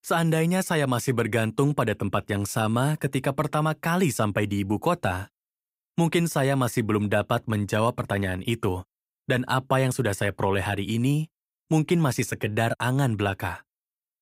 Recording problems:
none

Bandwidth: 15.5 kHz